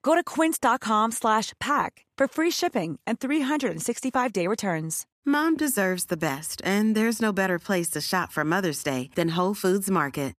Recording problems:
none

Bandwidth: 14.5 kHz